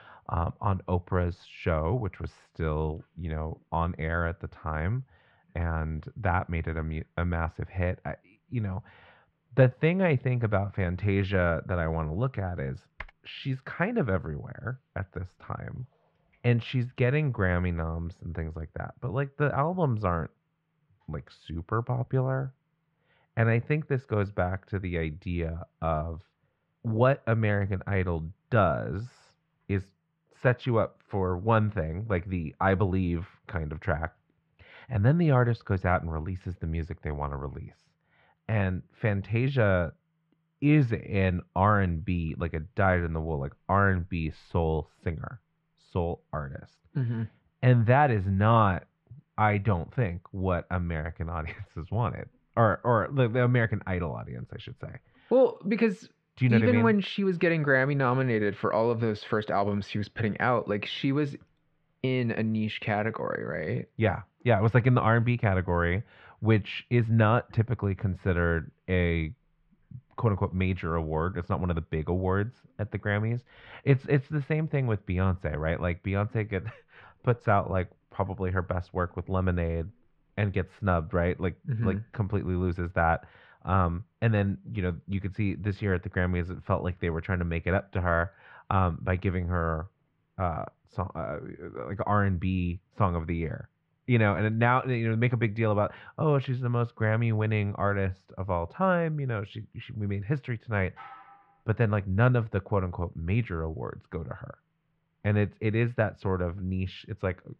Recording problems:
muffled; very; fading above 2.5 kHz
keyboard typing; faint; at 13 s; peak 15 dB below the speech
clattering dishes; faint; at 1:41; peak 20 dB below the speech

